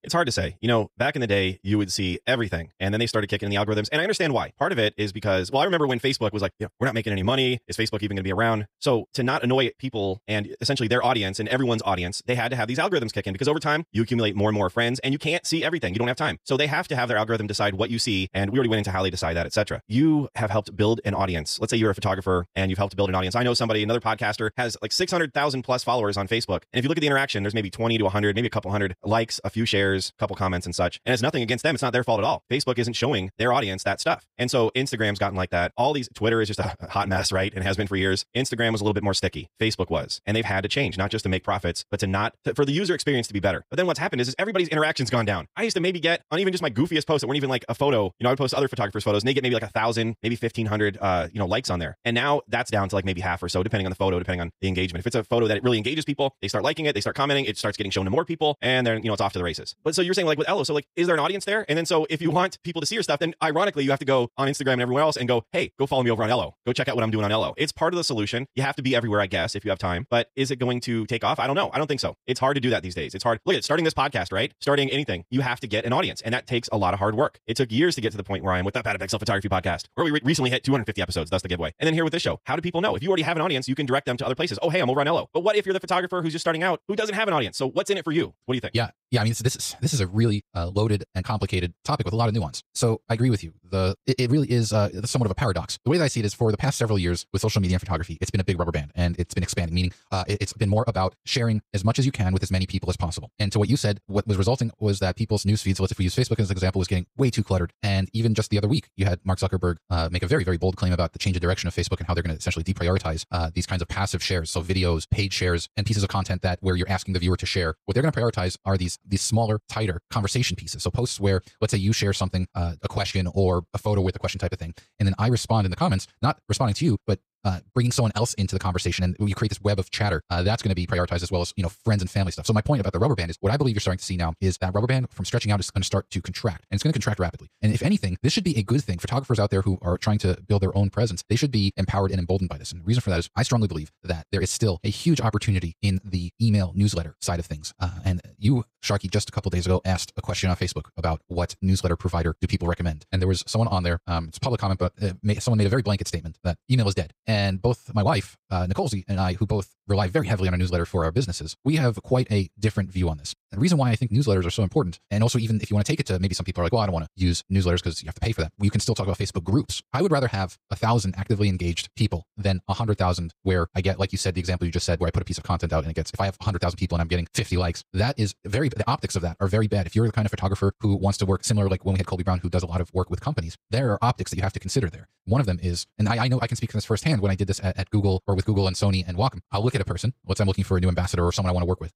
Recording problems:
wrong speed, natural pitch; too fast; 1.7 times normal speed

